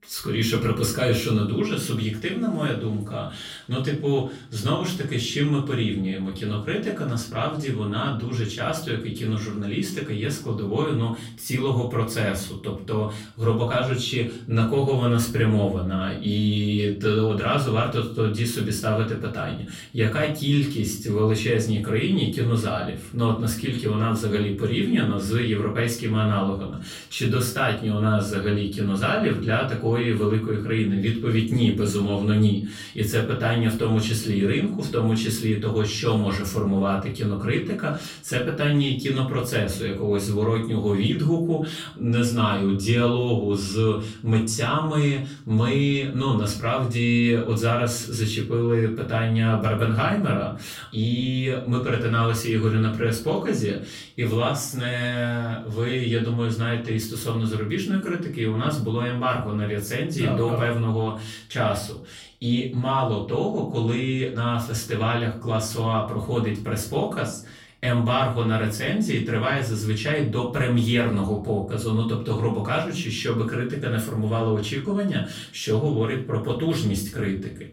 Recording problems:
off-mic speech; far
room echo; slight; dies away in 0.4 s

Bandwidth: 16 kHz